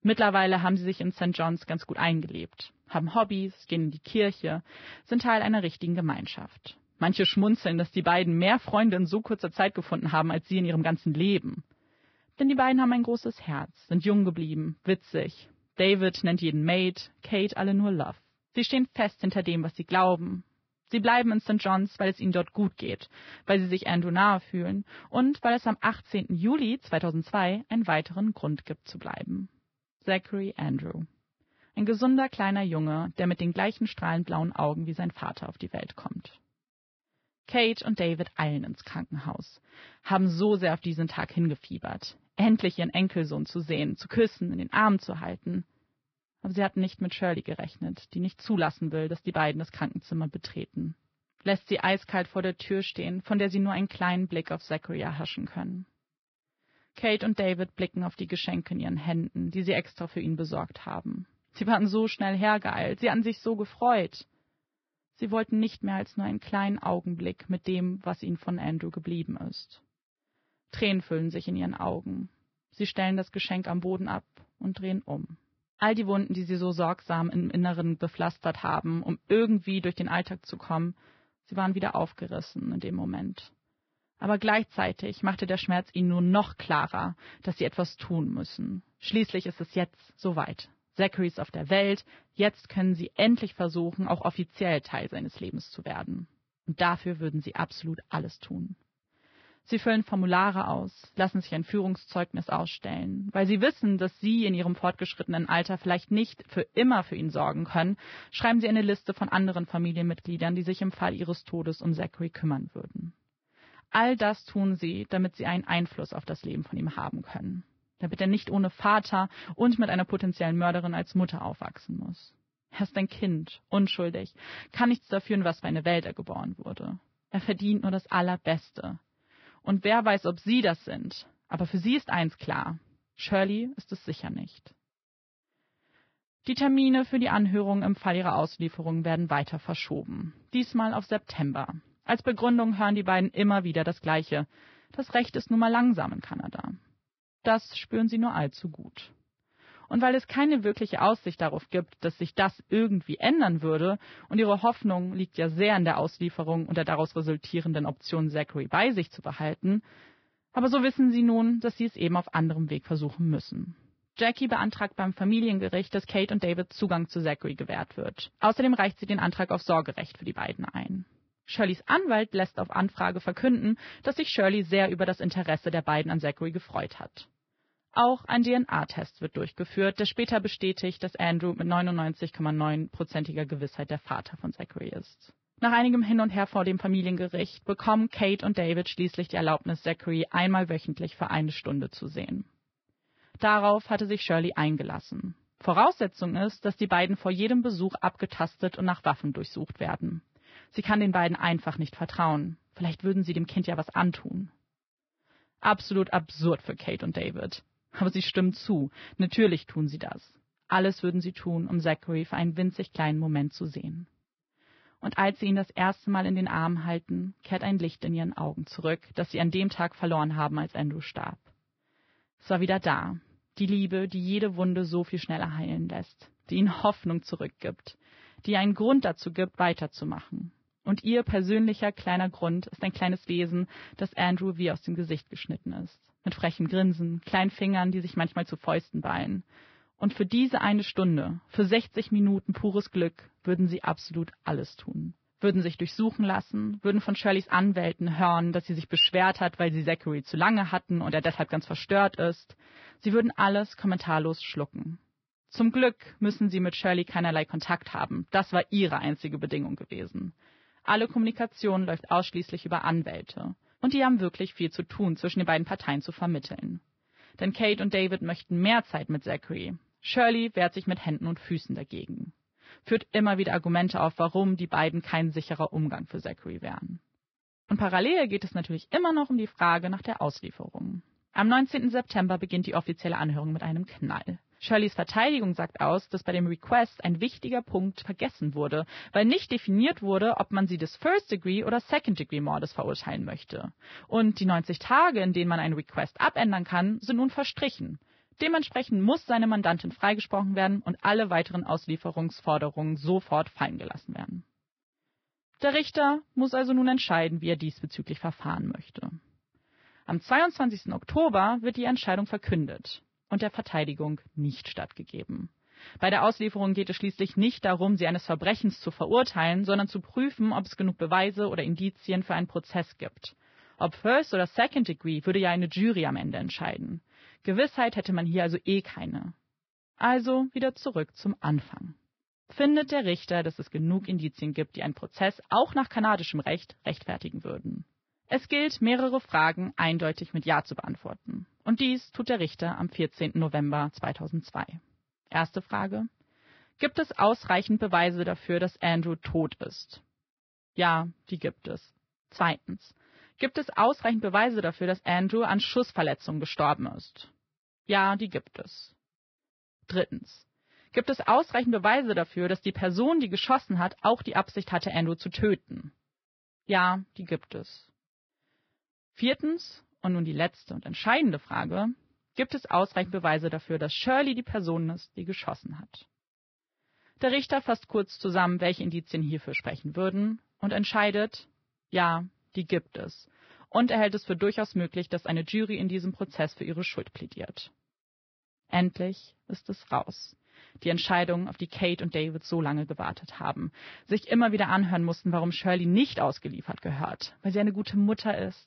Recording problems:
garbled, watery; badly; nothing above 5.5 kHz

